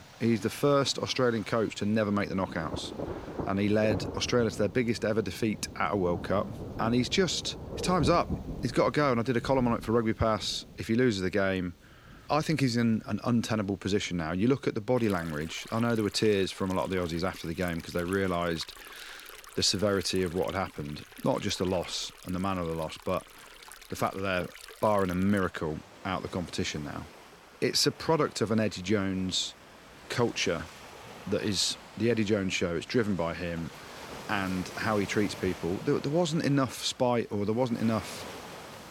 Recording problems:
rain or running water; noticeable; throughout; 15 dB below the speech

